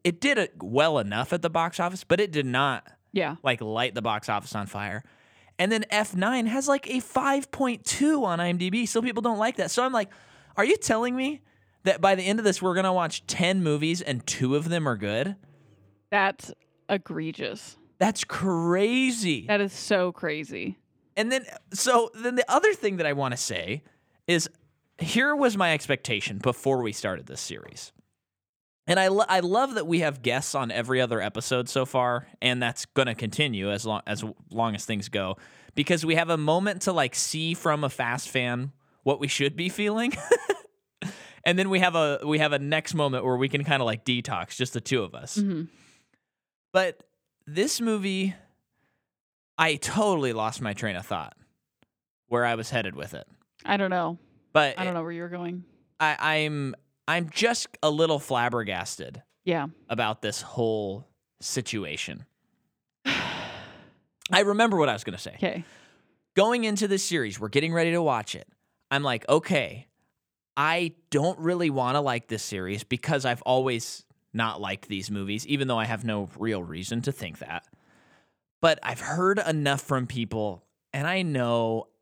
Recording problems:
none

